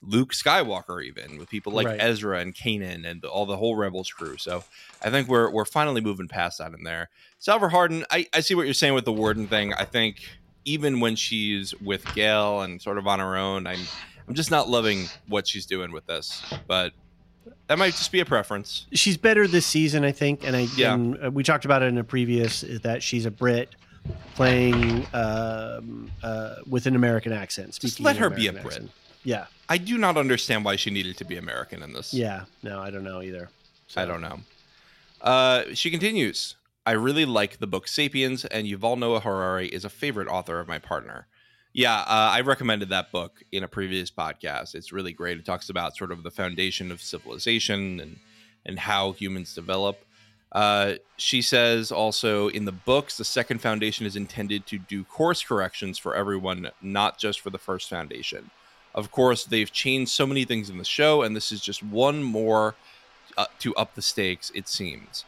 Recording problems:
household noises; noticeable; throughout; 15 dB below the speech

